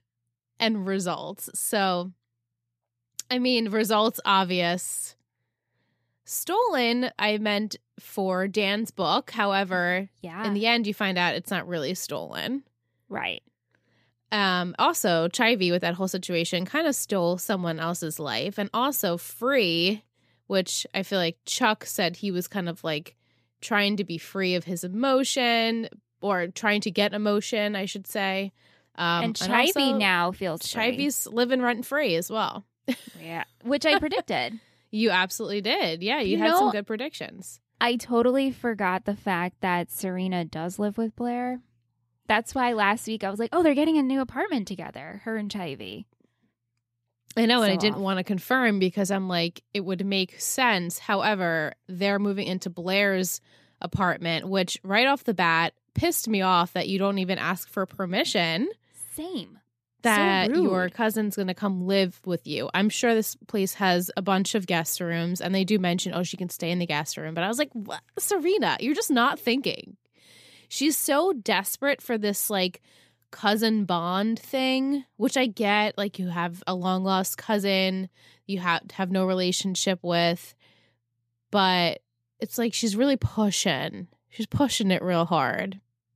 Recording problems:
none

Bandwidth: 14.5 kHz